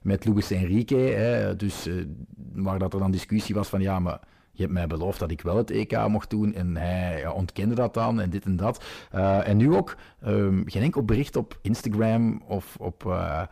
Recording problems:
distortion; slight; 10 dB below the speech

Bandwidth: 15 kHz